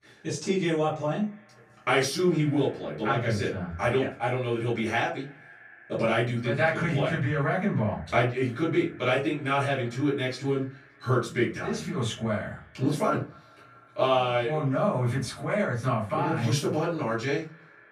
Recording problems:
off-mic speech; far
echo of what is said; faint; throughout; 240 ms later, 25 dB below the speech
room echo; slight; dies away in 0.3 s

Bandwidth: 14.5 kHz